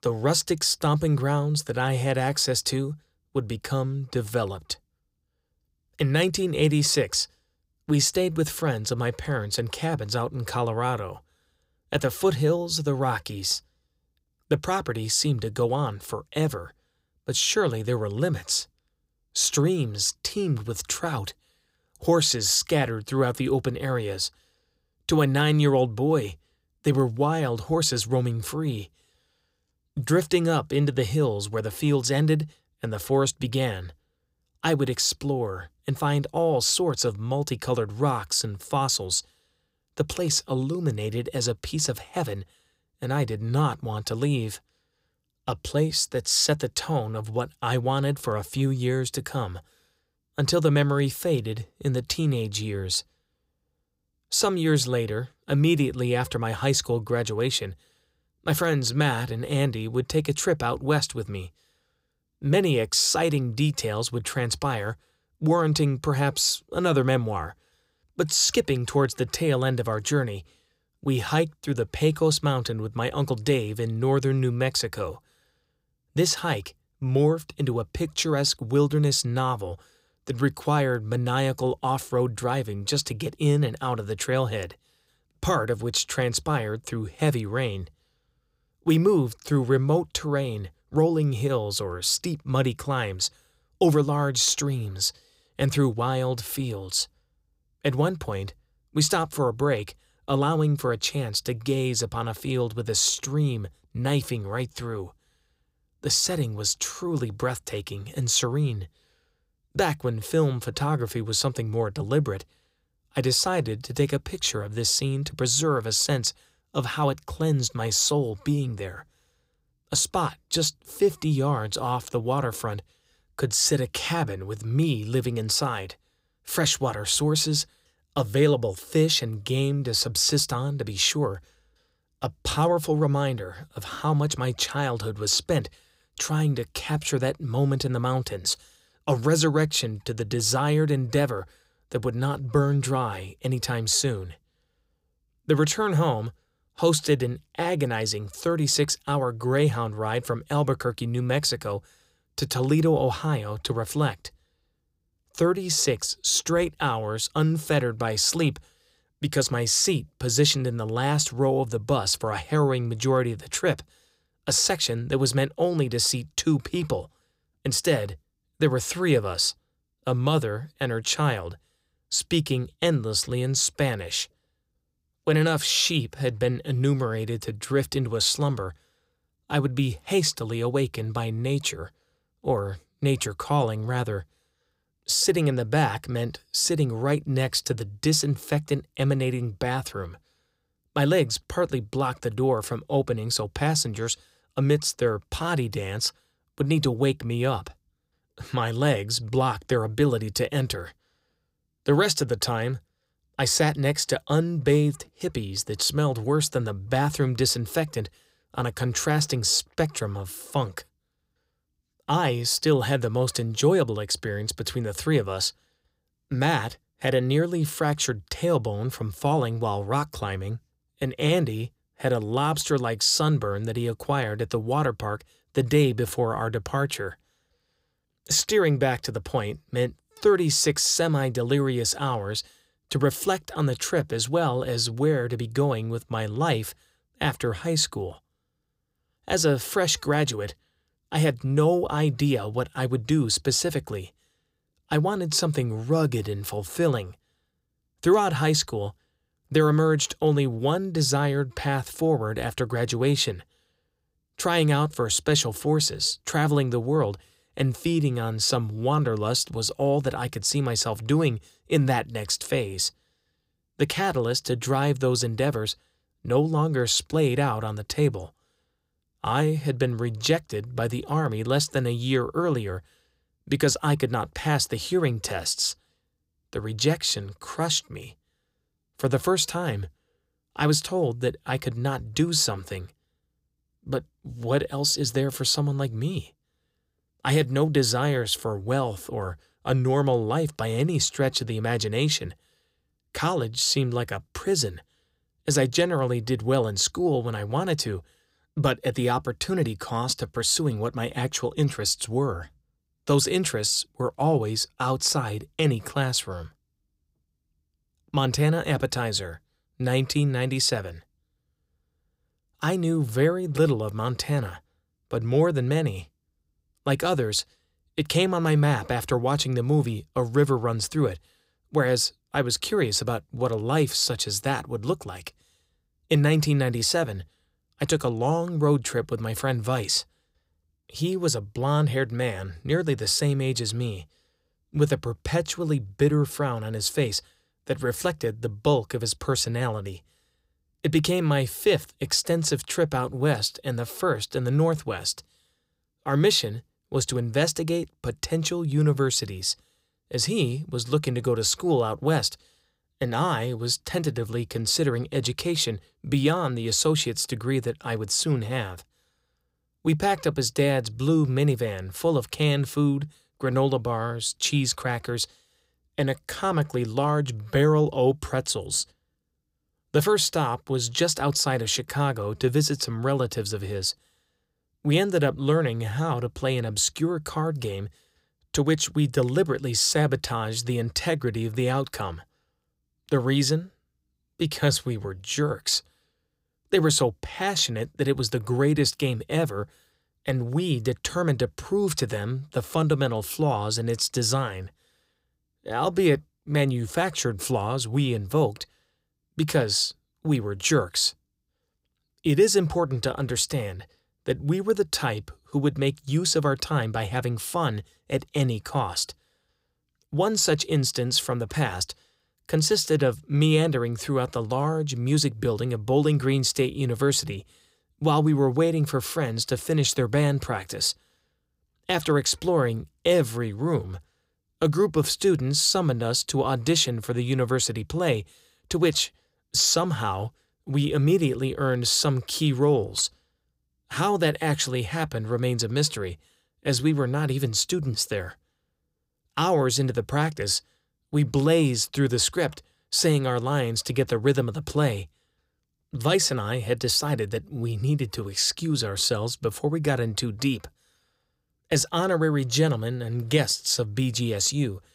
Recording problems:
none

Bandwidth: 15.5 kHz